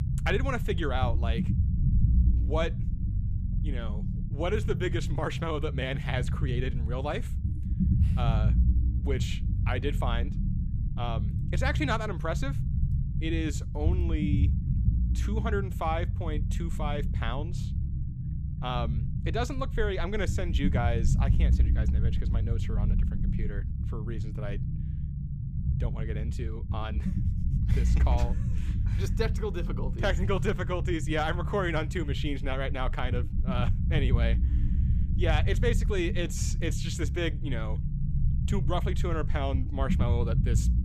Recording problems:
low rumble; loud; throughout; 9 dB below the speech

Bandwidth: 15 kHz